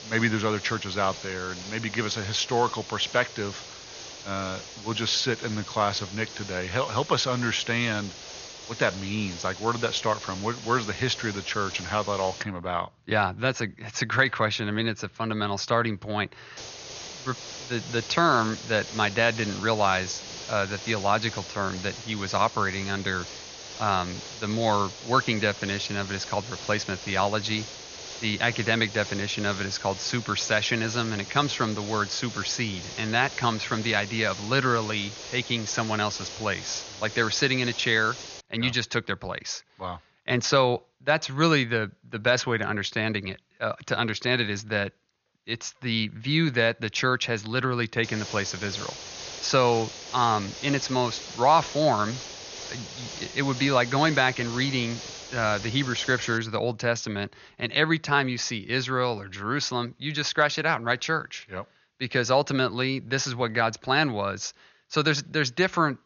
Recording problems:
high frequencies cut off; noticeable; nothing above 6.5 kHz
hiss; noticeable; until 12 s, from 17 to 38 s and from 48 to 56 s; 10 dB below the speech

